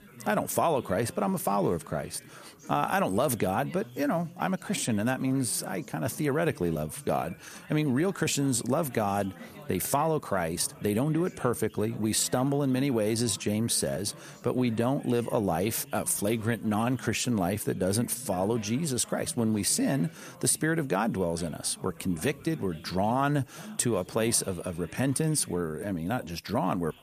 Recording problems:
background chatter; faint; throughout; 3 voices, 20 dB below the speech

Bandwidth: 14.5 kHz